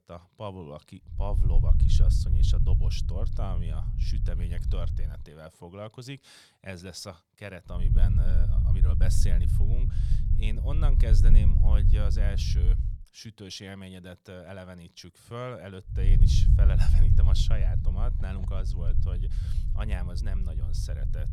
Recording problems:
low rumble; loud; from 1 to 5 s, from 8 to 13 s and from 16 s on; 2 dB below the speech

